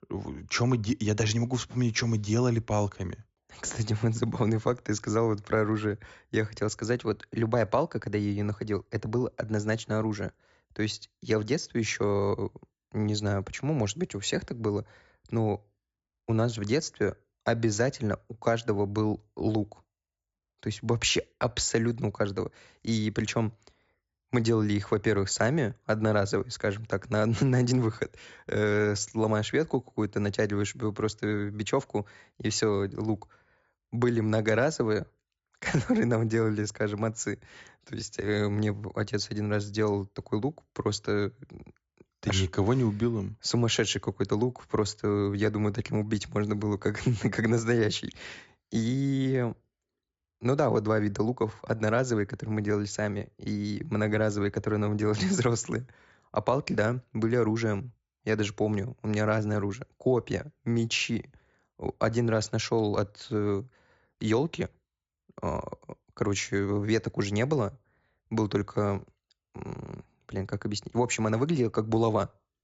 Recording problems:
high frequencies cut off; noticeable; nothing above 7.5 kHz

